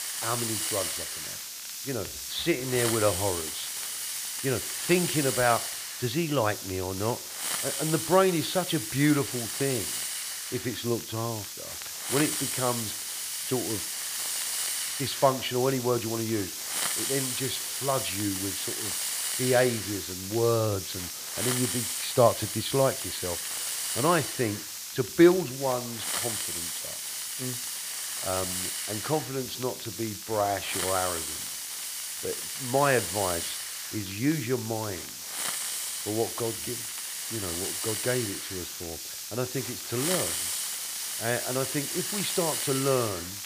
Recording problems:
high frequencies cut off; severe; nothing above 4.5 kHz
hiss; loud; throughout; 2 dB below the speech
crackle, like an old record; faint; 20 dB below the speech

